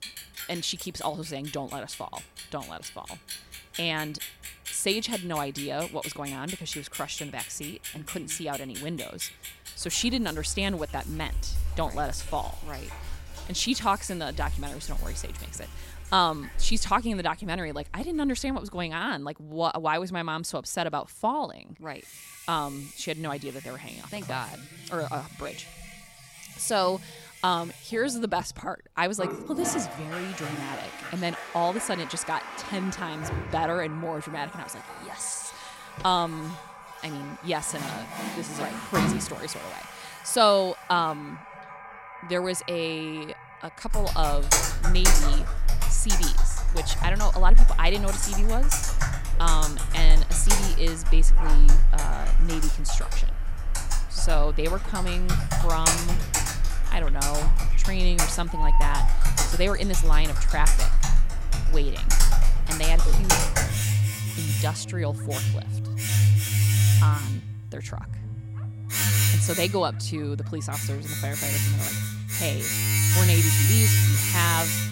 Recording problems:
household noises; very loud; throughout; 4 dB above the speech
animal sounds; noticeable; from 51 s on; 15 dB below the speech

